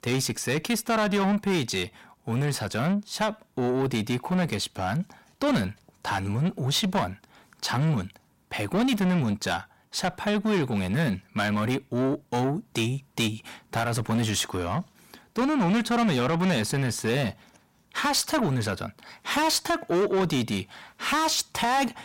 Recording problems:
distortion; heavy; 7 dB below the speech

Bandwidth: 16 kHz